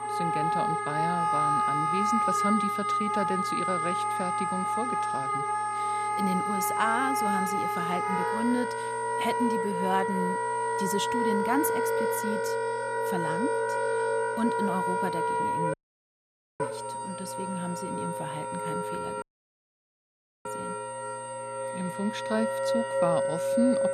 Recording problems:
background music; very loud; throughout; 4 dB above the speech
high-pitched whine; noticeable; throughout; 8.5 kHz, 15 dB below the speech
electrical hum; faint; throughout; 60 Hz, 25 dB below the speech
audio cutting out; at 16 s for 1 s and at 19 s for 1 s

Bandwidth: 14.5 kHz